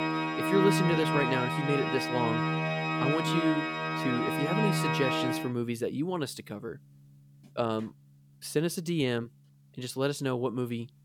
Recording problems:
background music; very loud; throughout; 2 dB above the speech

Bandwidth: 18.5 kHz